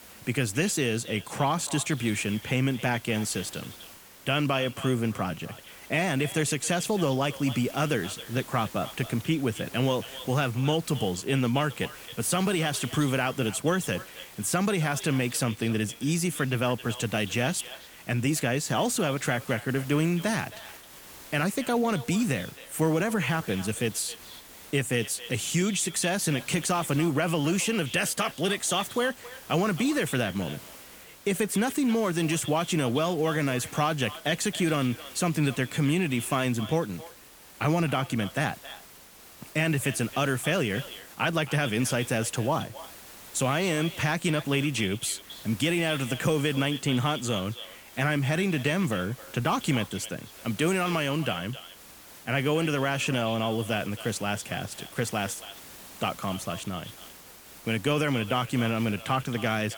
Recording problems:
echo of what is said; noticeable; throughout; 270 ms later, 15 dB below the speech
hiss; noticeable; throughout; 20 dB below the speech

